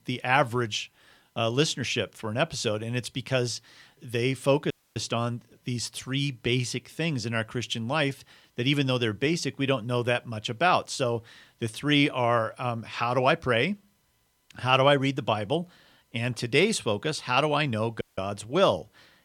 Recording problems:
audio cutting out; at 4.5 s and at 18 s

